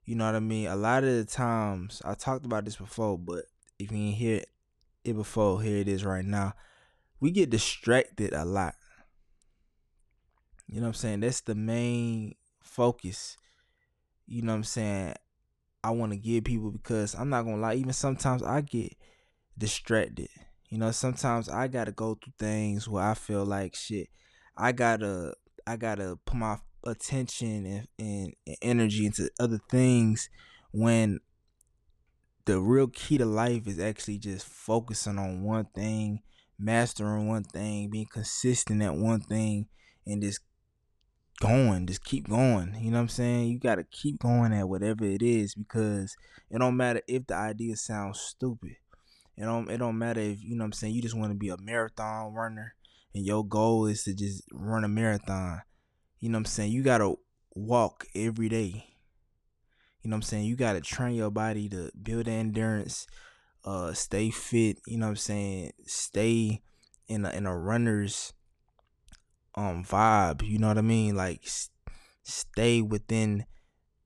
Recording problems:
none

